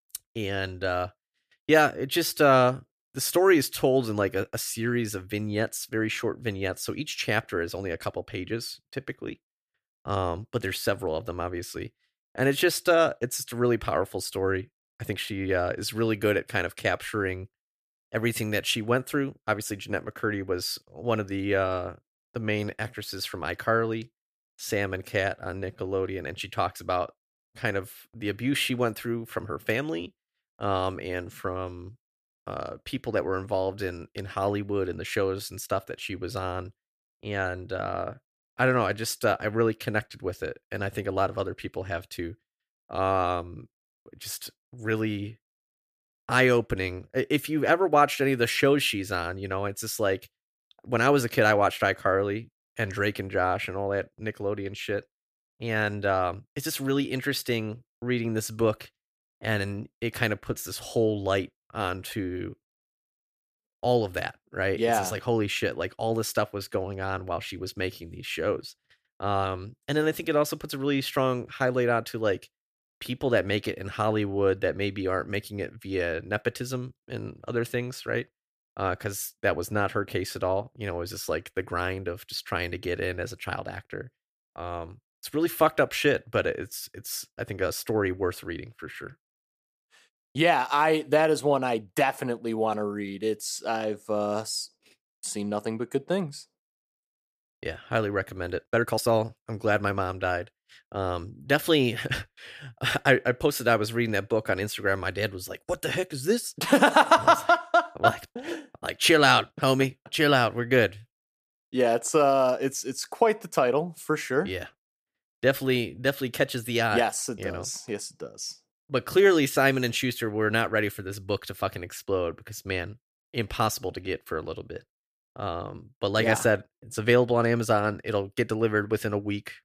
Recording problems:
uneven, jittery; strongly; from 15 s to 1:39

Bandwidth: 14.5 kHz